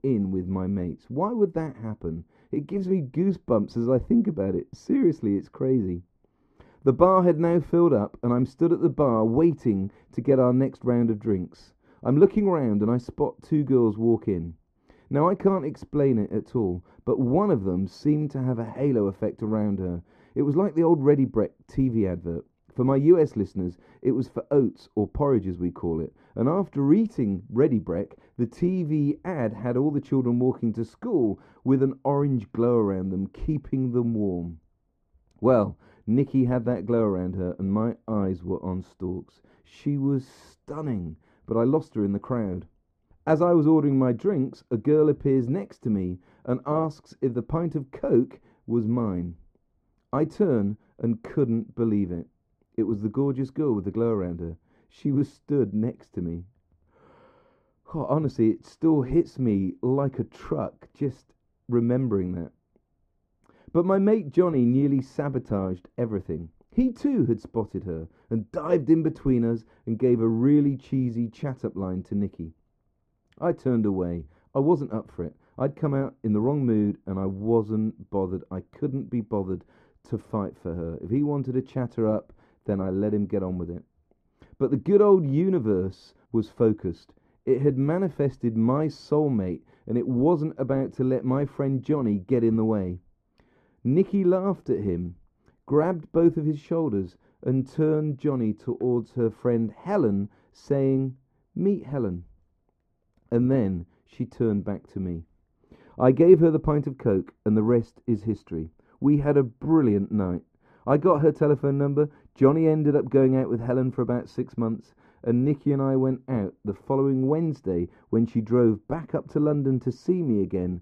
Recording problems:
muffled; very; fading above 1.5 kHz

